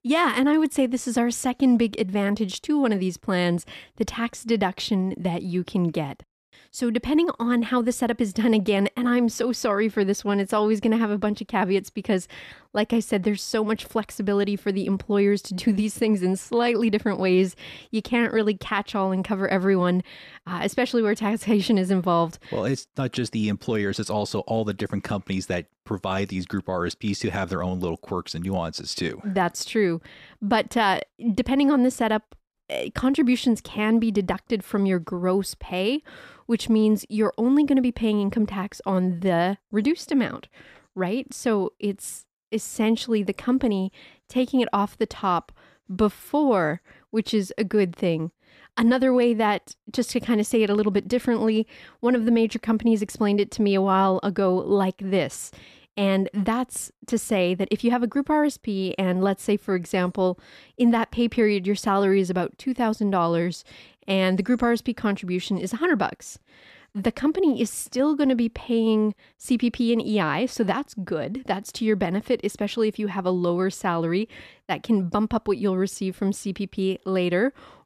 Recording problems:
none

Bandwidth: 14.5 kHz